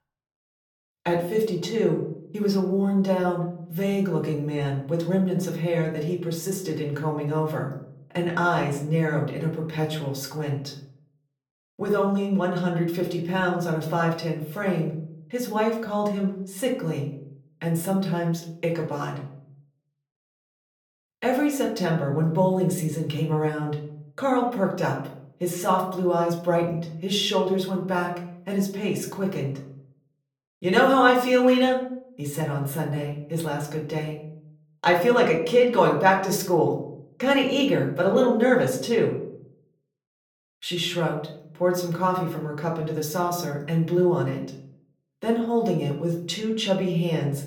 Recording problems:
off-mic speech; far
room echo; slight; dies away in 0.5 s

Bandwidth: 18 kHz